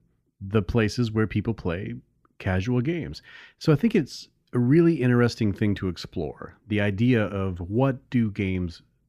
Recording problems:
none

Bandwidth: 14.5 kHz